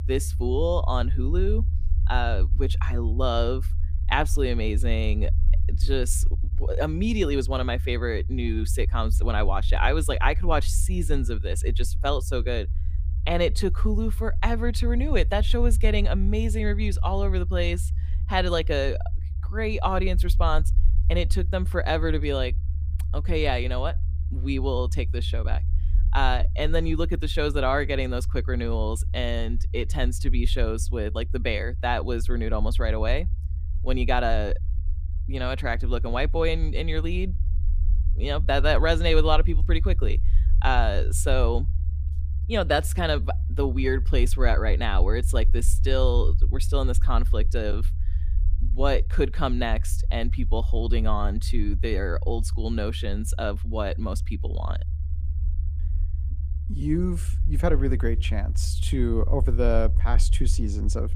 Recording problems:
low rumble; noticeable; throughout; 20 dB below the speech

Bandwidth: 15 kHz